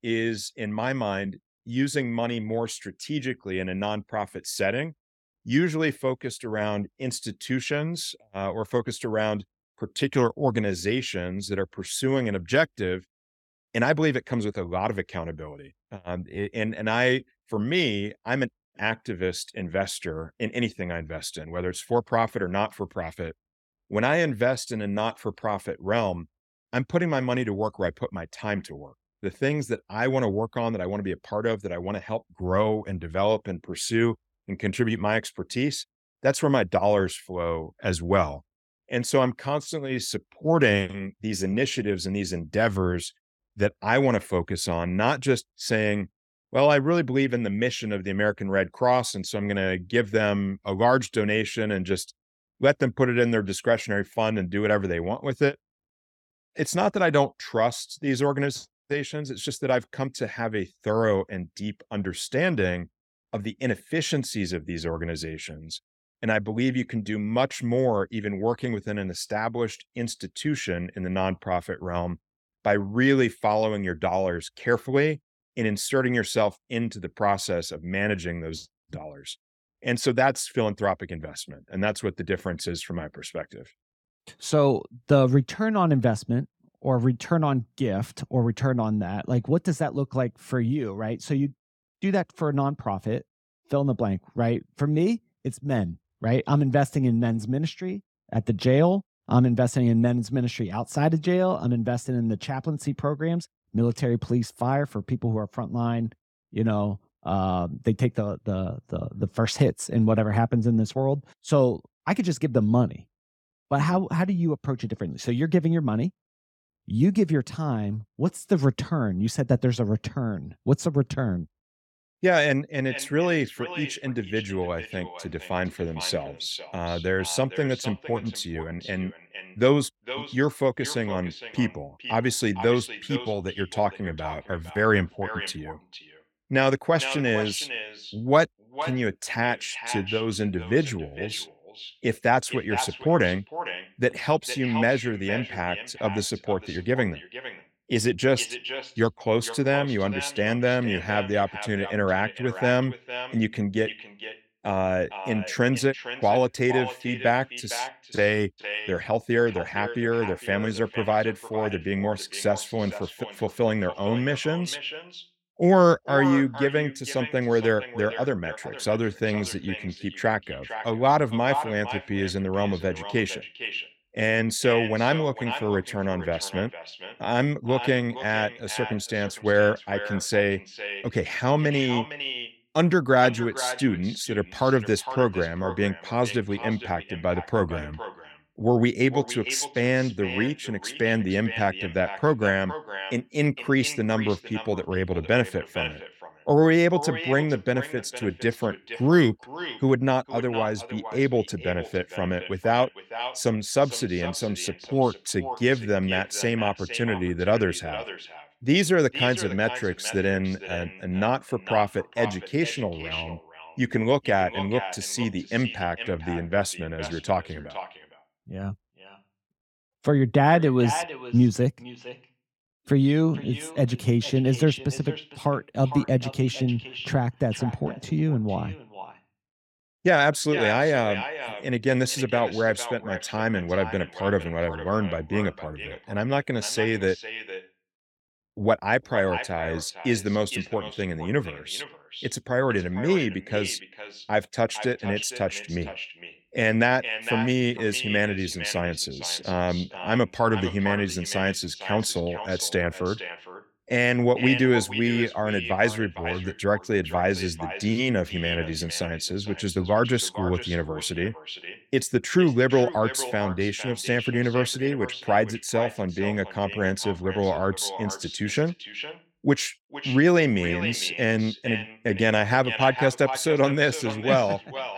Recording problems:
echo of what is said; strong; from 2:03 on; 460 ms later, 10 dB below the speech

